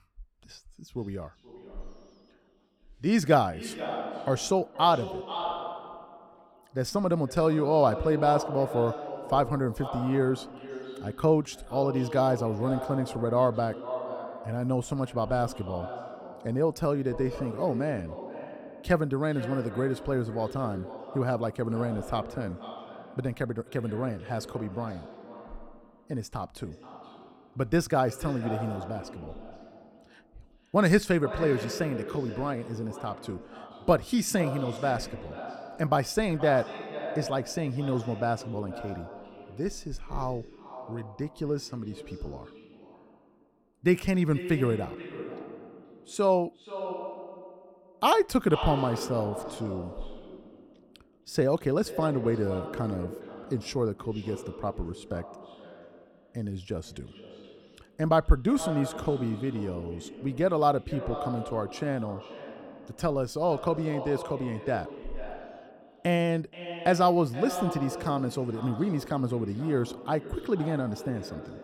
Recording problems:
echo of what is said; strong; throughout; 480 ms later, 10 dB below the speech

